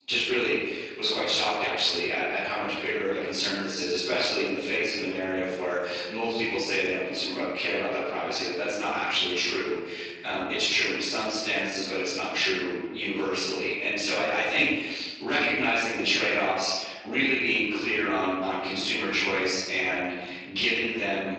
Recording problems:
room echo; strong; dies away in 1.2 s
off-mic speech; far
garbled, watery; slightly
thin; very slightly; fading below 450 Hz

